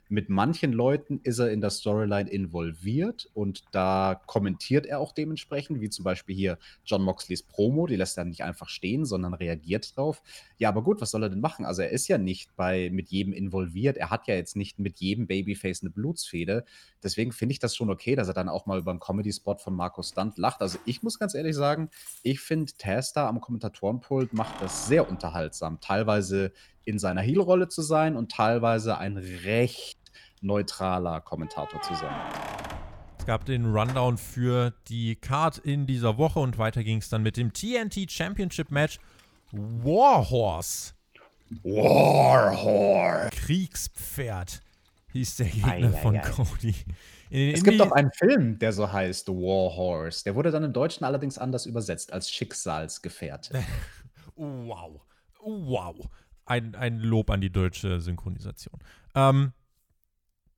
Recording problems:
household noises; noticeable; throughout; 15 dB below the speech

